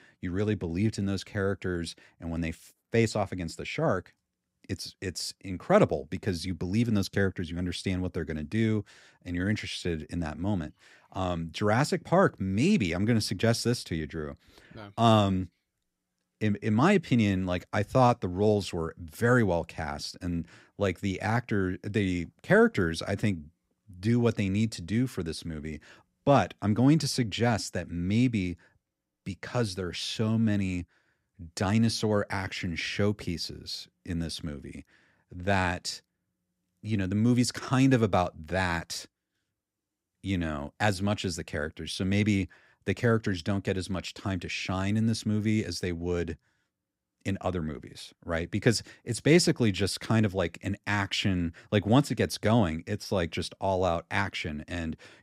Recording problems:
none

